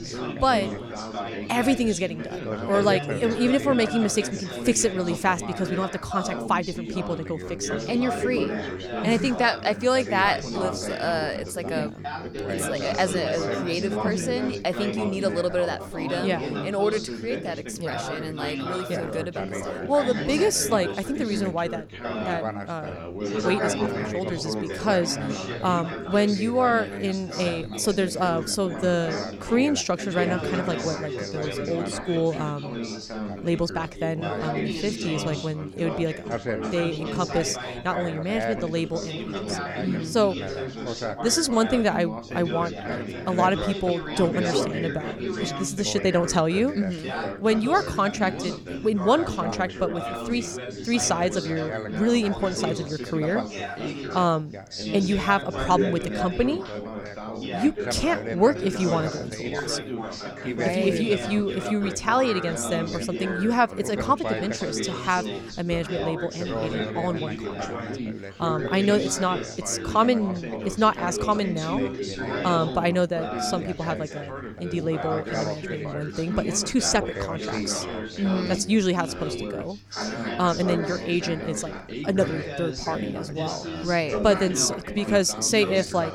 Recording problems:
background chatter; loud; throughout; 4 voices, 5 dB below the speech

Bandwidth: 18 kHz